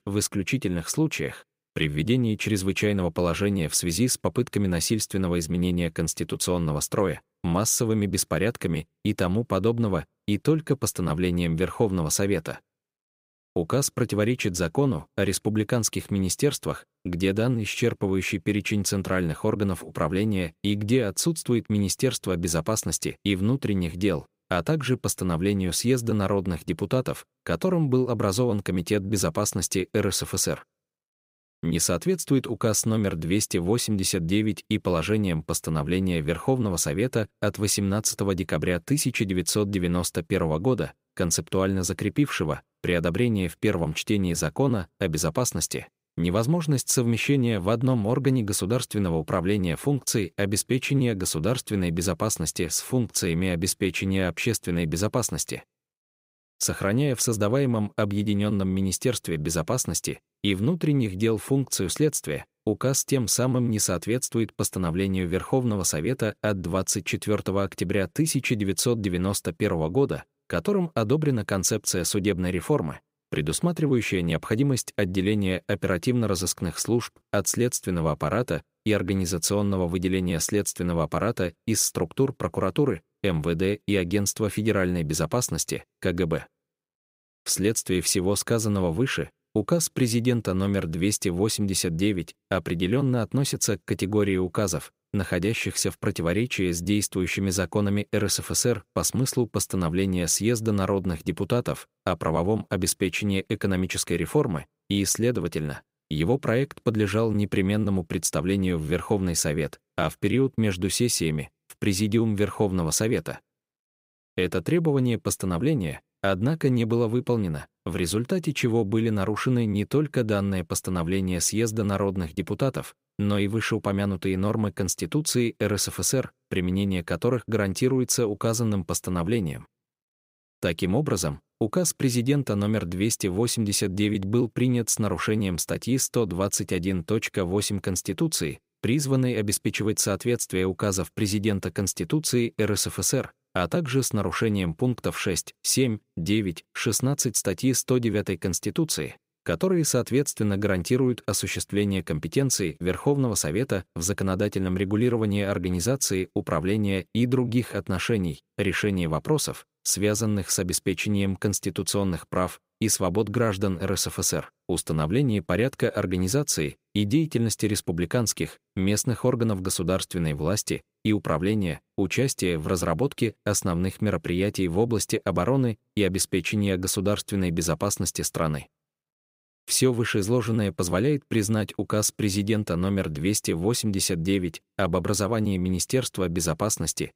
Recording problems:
none

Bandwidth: 15.5 kHz